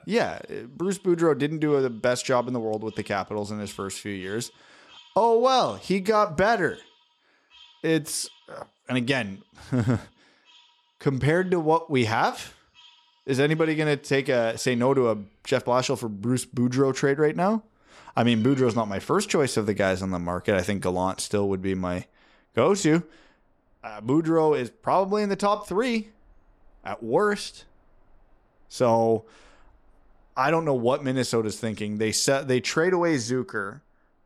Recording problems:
animal sounds; faint; throughout; 30 dB below the speech

